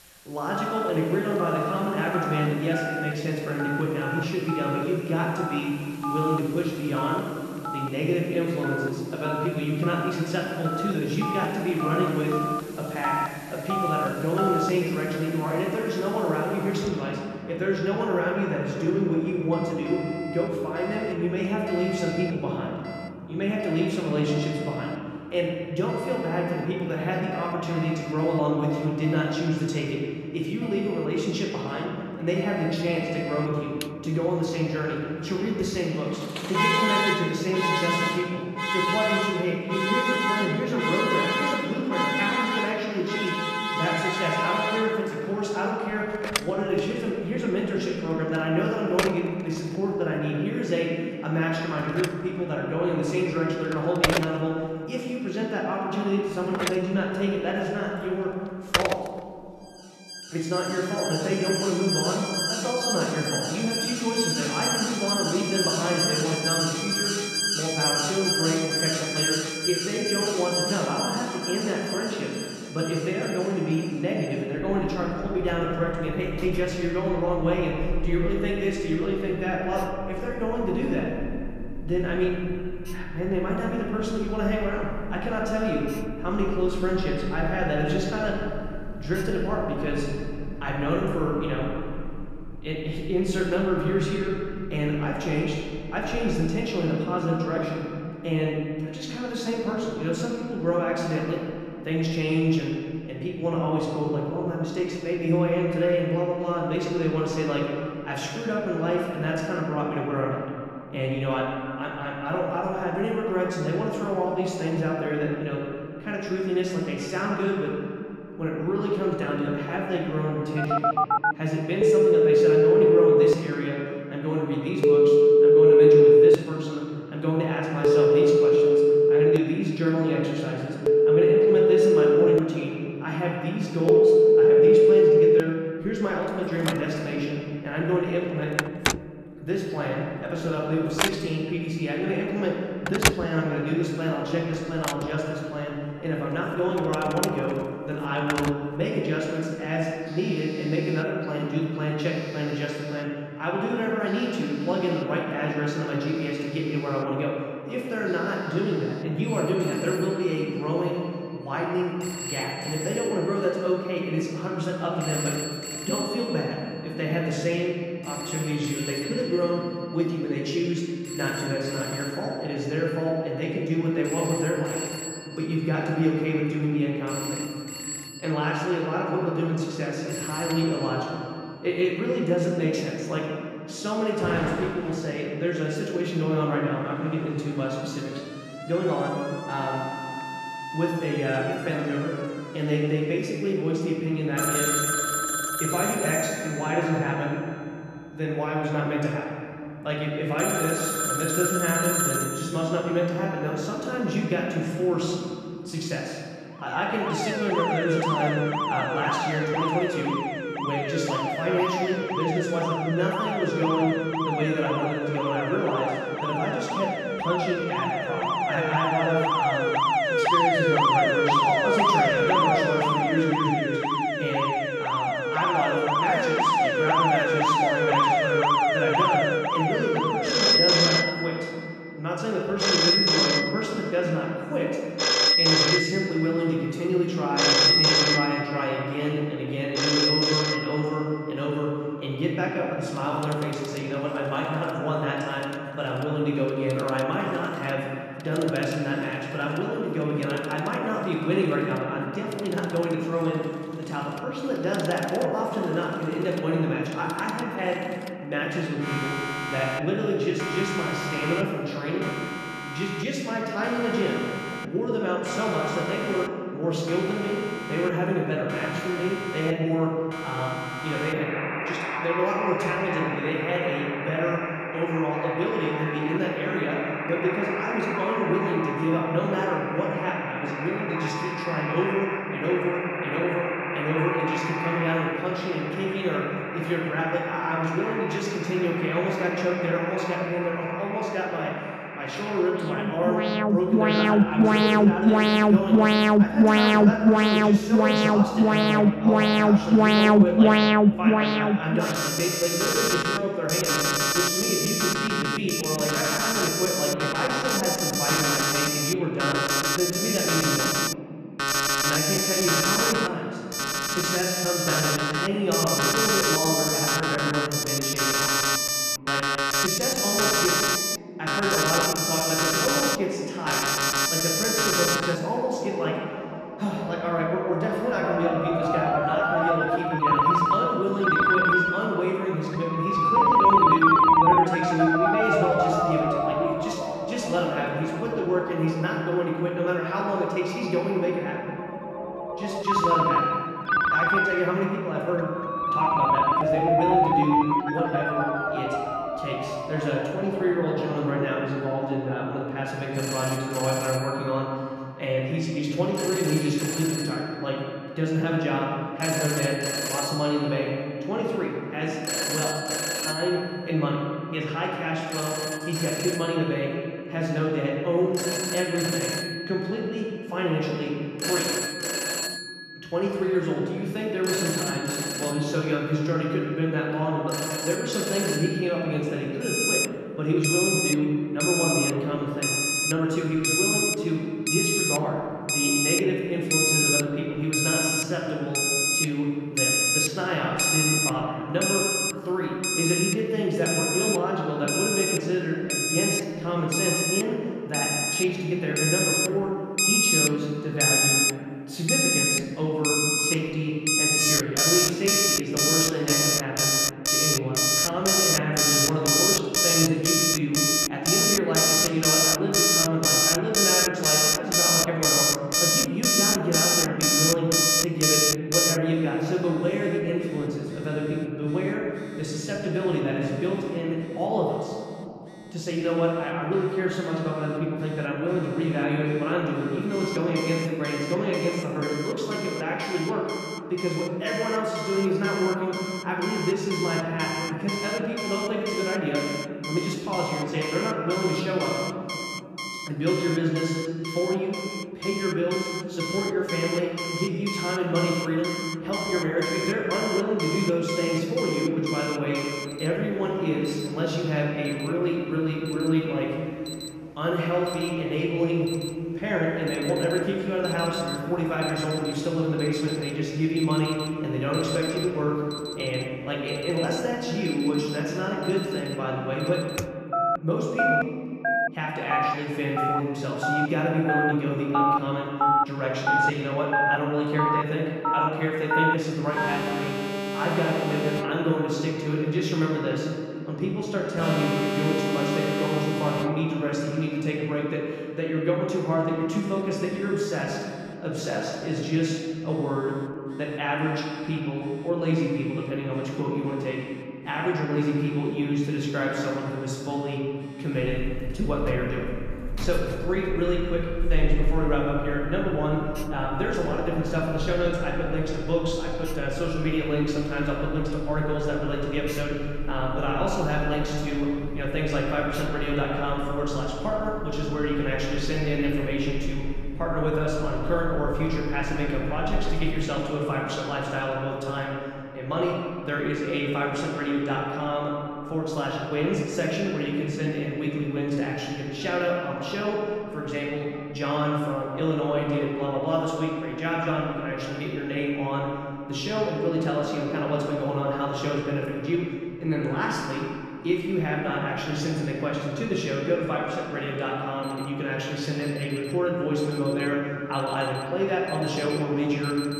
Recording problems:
off-mic speech; far
room echo; noticeable; dies away in 2.5 s
alarms or sirens; very loud; throughout; 3 dB above the speech

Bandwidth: 14 kHz